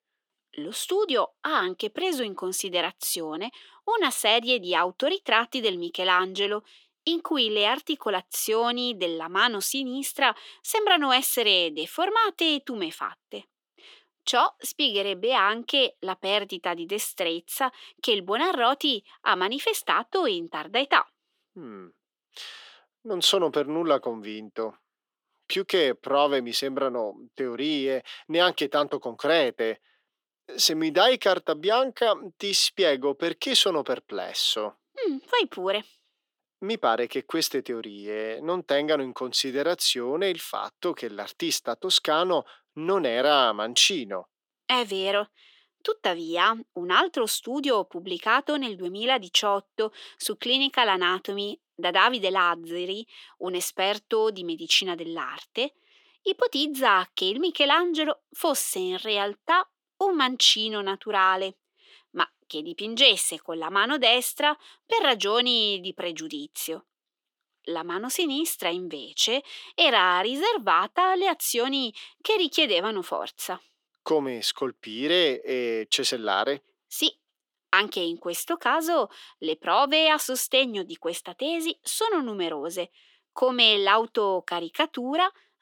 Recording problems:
thin; somewhat; fading below 350 Hz

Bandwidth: 18.5 kHz